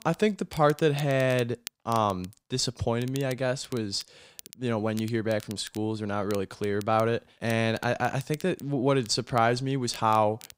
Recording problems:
crackle, like an old record; noticeable; 20 dB below the speech

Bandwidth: 15.5 kHz